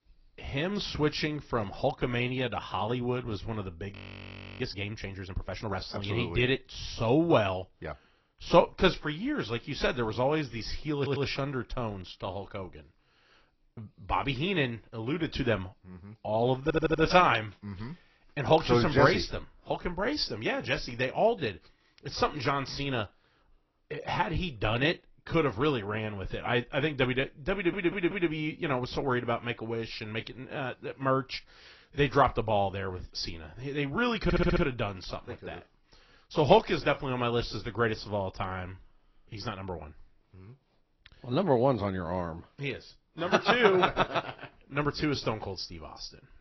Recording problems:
garbled, watery; badly
high frequencies cut off; noticeable; nothing above 6 kHz
audio freezing; at 4 s for 0.5 s
audio stuttering; 4 times, first at 11 s

